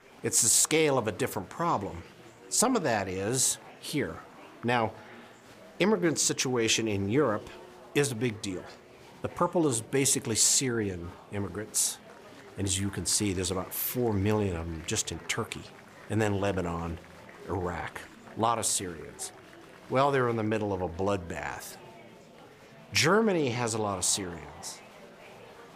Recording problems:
murmuring crowd; faint; throughout; 20 dB below the speech

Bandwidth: 15 kHz